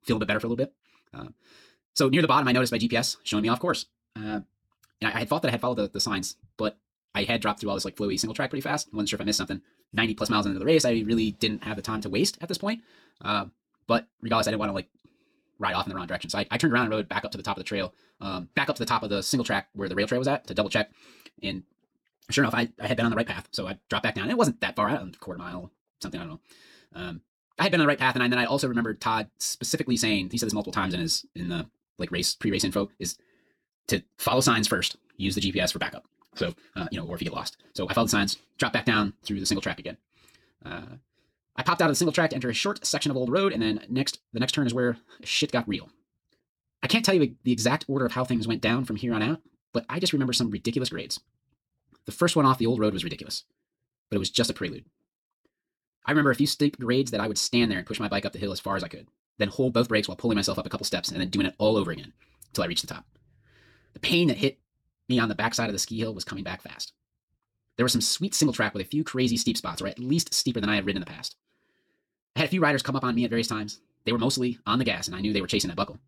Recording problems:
wrong speed, natural pitch; too fast; 1.7 times normal speed

